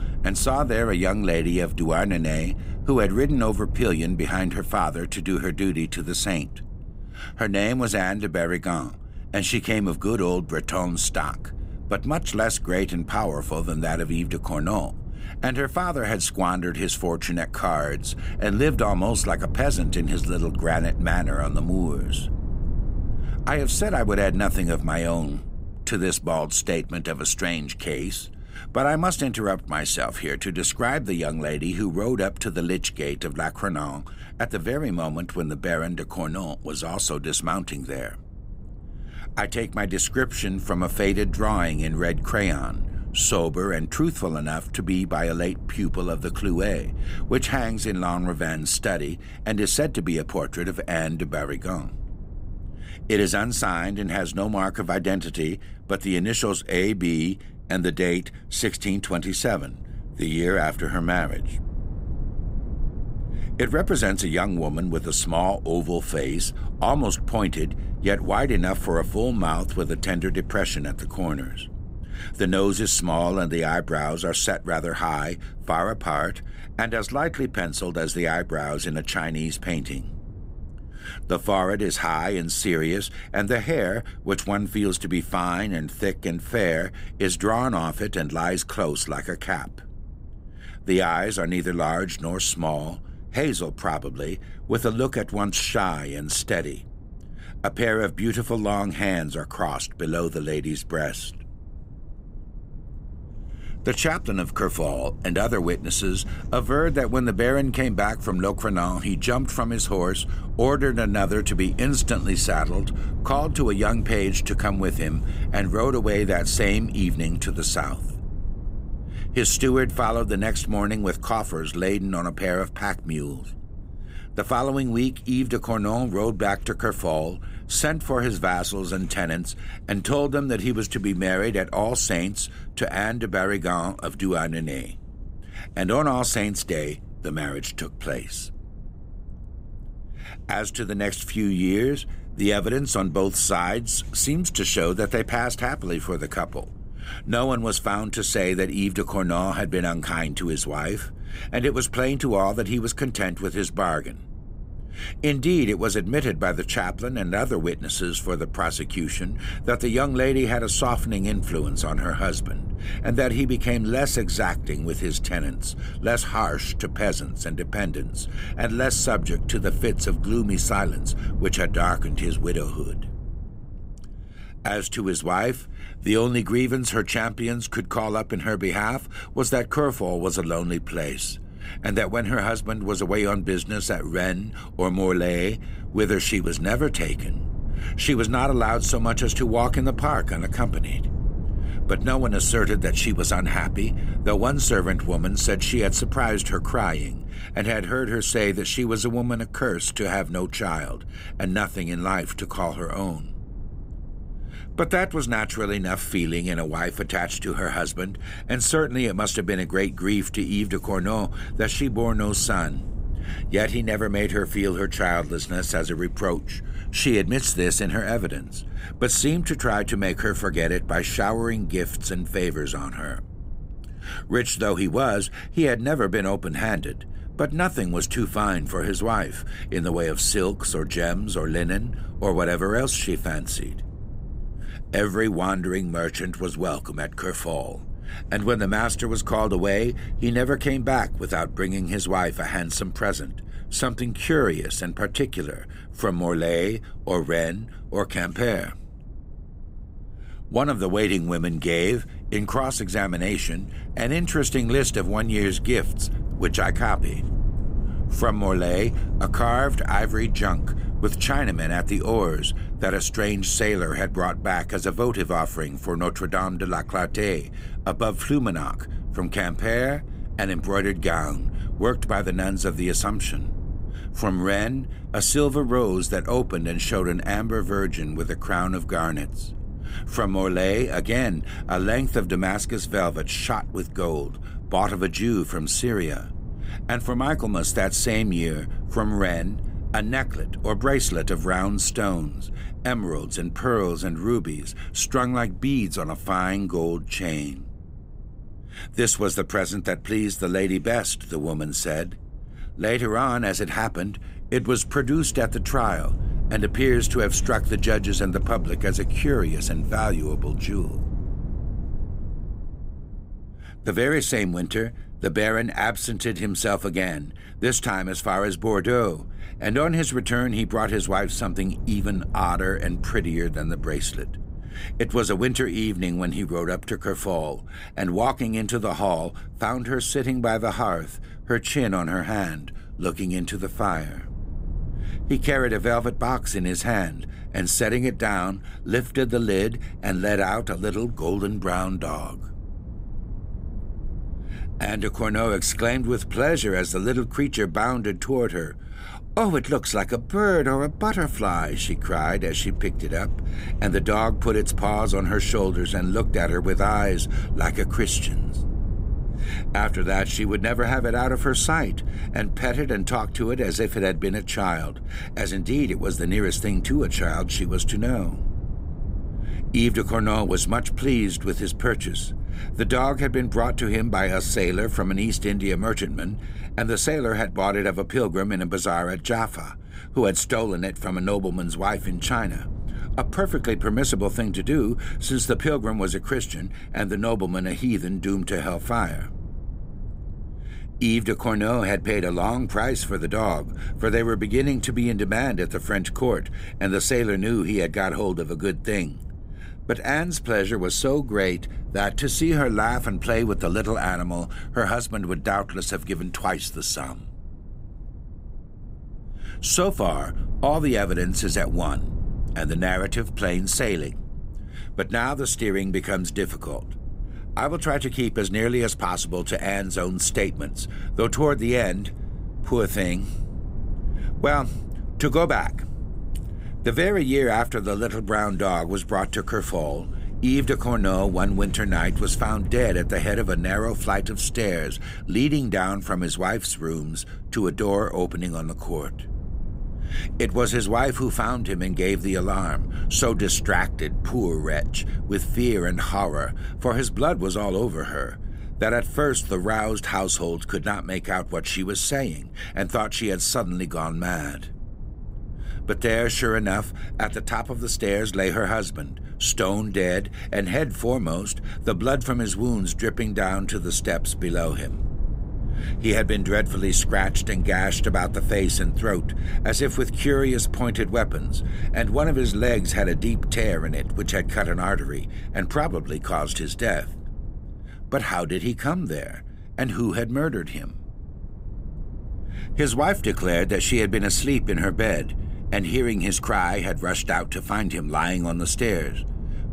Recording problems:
low rumble; faint; throughout; 20 dB below the speech

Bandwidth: 15.5 kHz